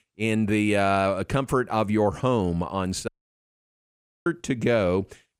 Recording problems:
audio cutting out; at 3 s for 1 s

